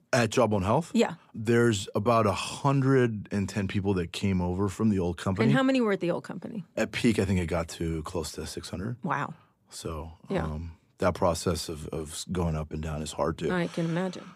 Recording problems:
none

